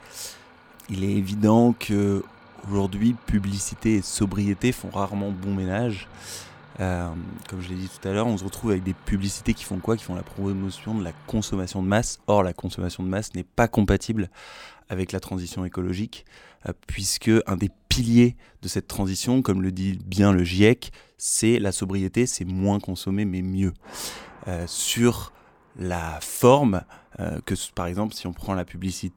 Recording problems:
traffic noise; faint; throughout; 25 dB below the speech

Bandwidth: 18.5 kHz